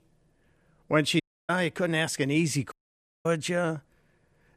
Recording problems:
audio cutting out; at 1 s and at 2.5 s for 0.5 s

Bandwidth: 13.5 kHz